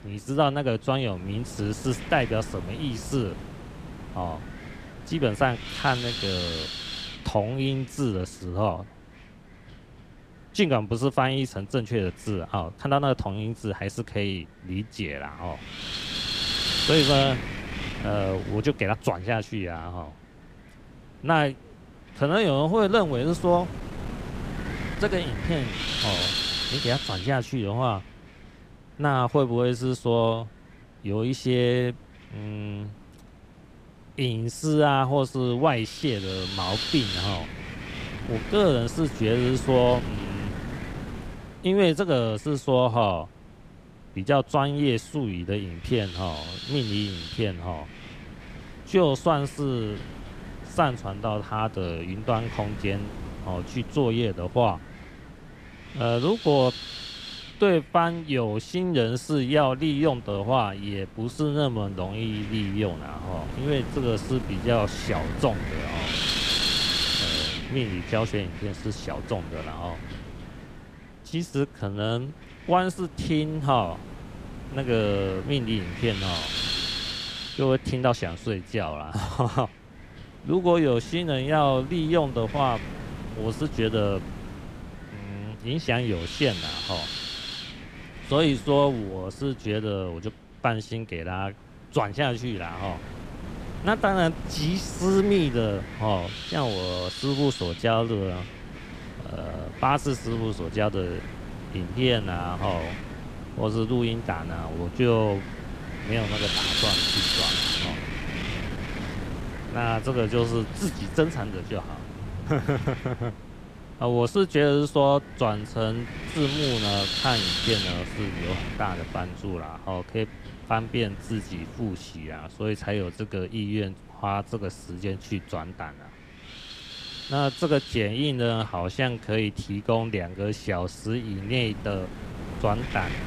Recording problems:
wind noise on the microphone; heavy; 4 dB below the speech

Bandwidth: 15 kHz